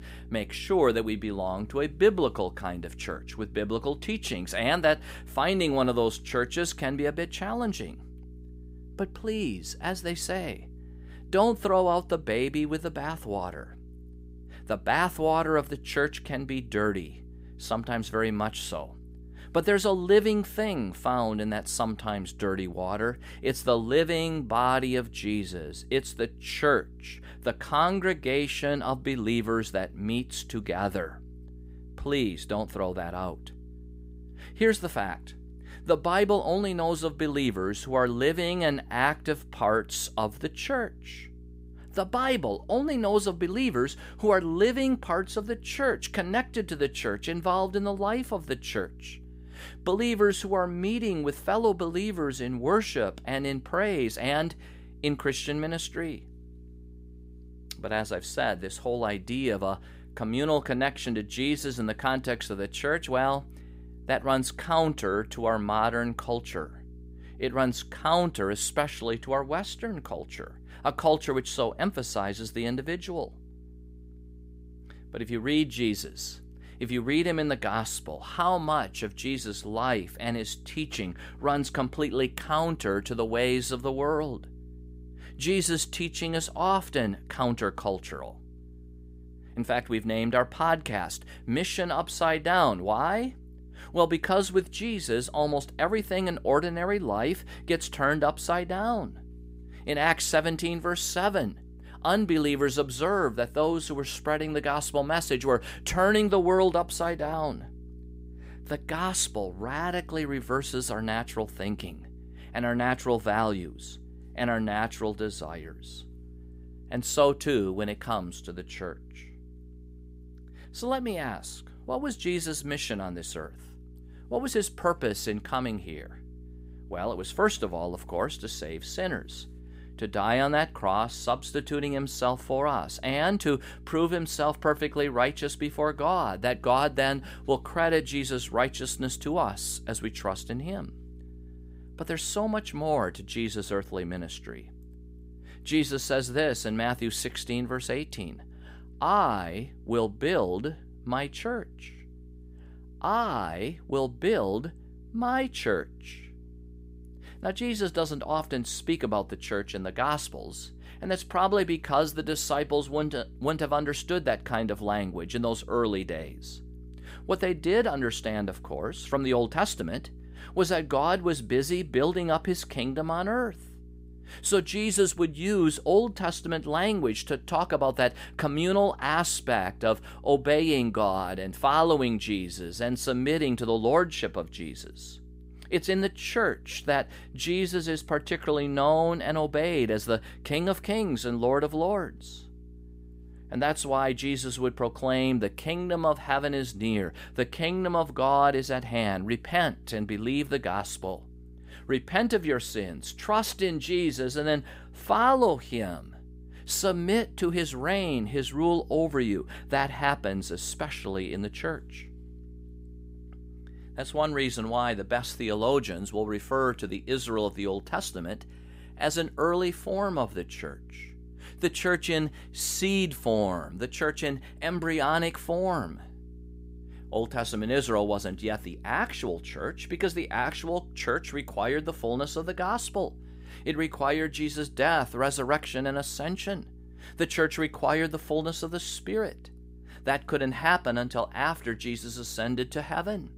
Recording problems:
electrical hum; faint; throughout; 60 Hz, 30 dB below the speech

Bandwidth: 15.5 kHz